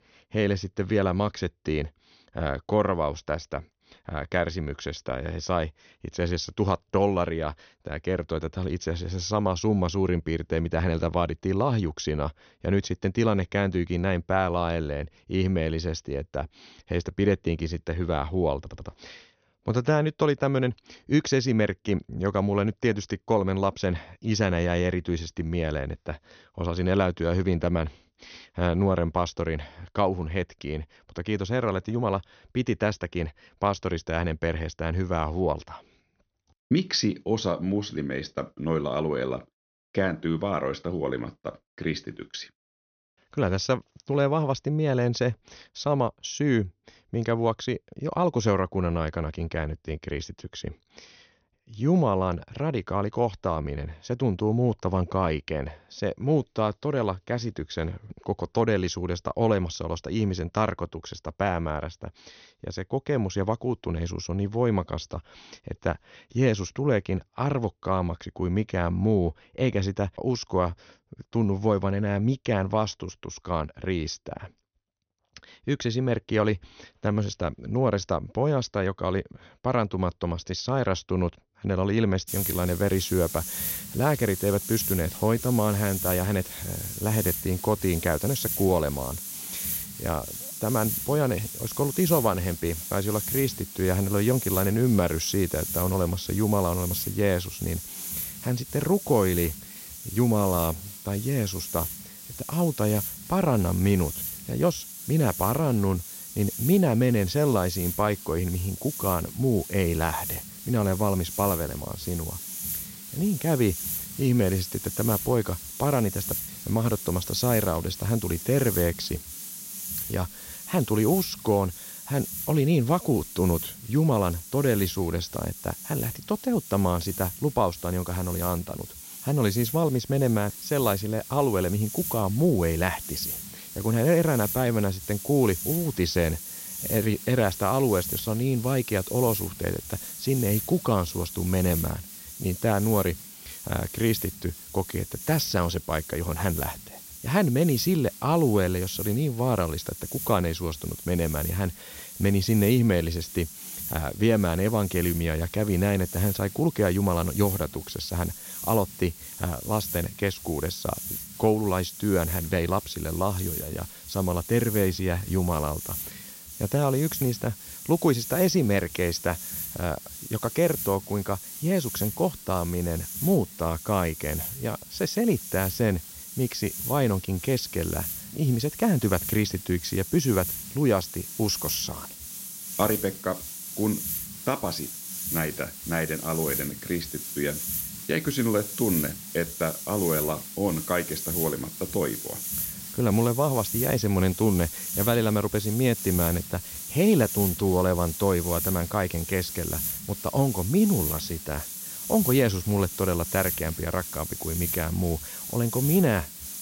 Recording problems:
high frequencies cut off; noticeable; nothing above 6.5 kHz
hiss; loud; from 1:22 on; 7 dB below the speech
audio stuttering; at 19 s

